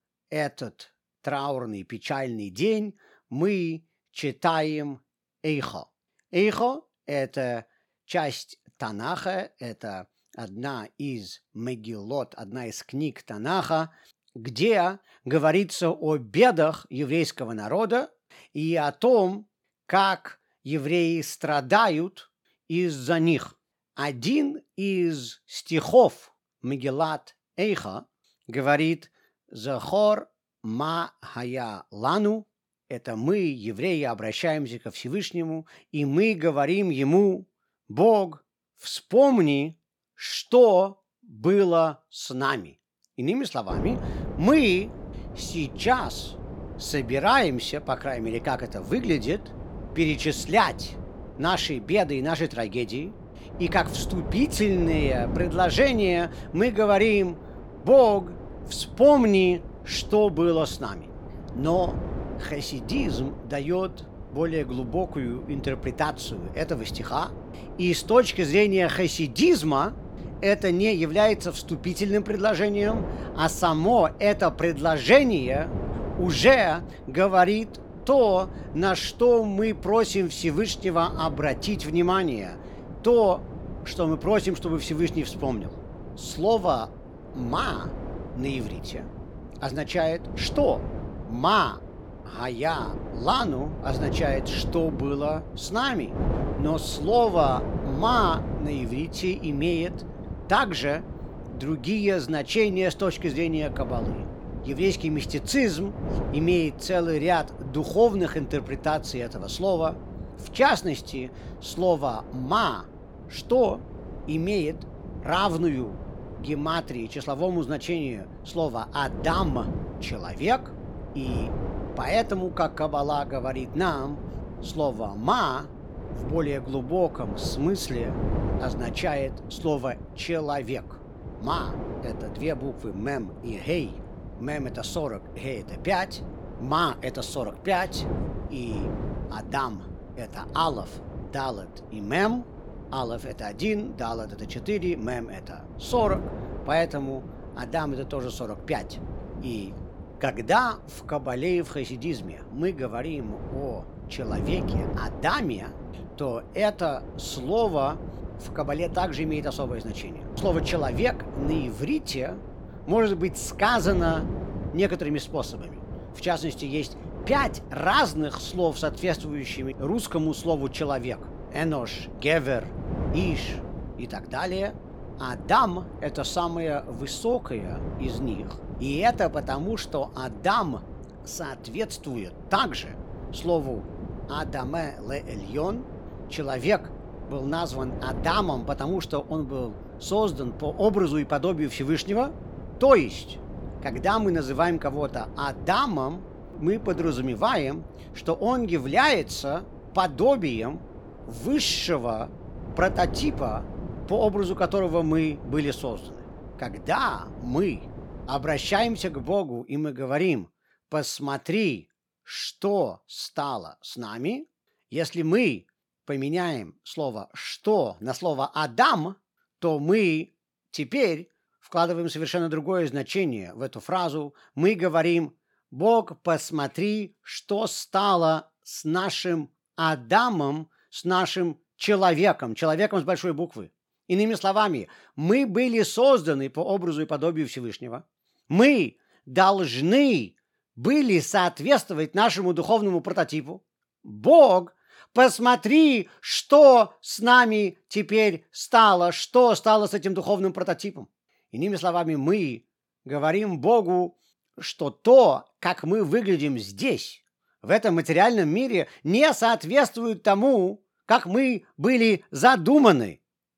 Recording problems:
wind noise on the microphone; occasional gusts; from 44 s to 3:29; 20 dB below the speech

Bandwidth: 17 kHz